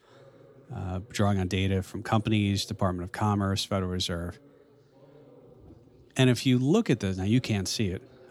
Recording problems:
background chatter; faint; throughout; 3 voices, 30 dB below the speech

